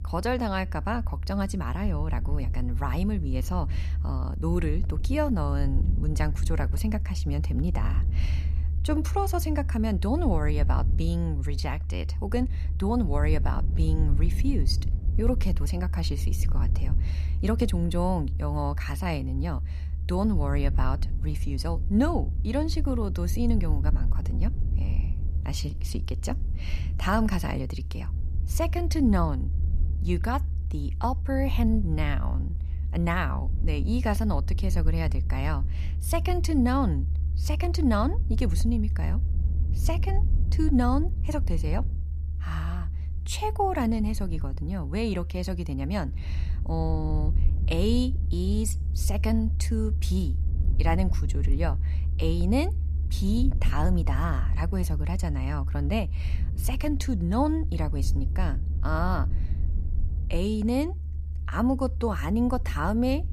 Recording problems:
low rumble; noticeable; throughout; 15 dB below the speech

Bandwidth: 14.5 kHz